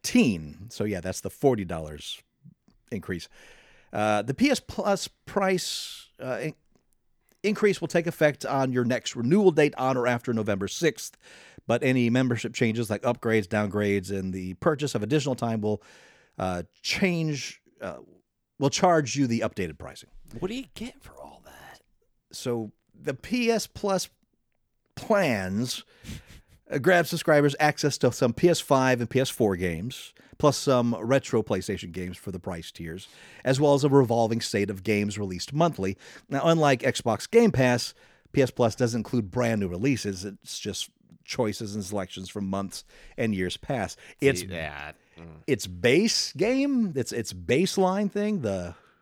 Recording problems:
none

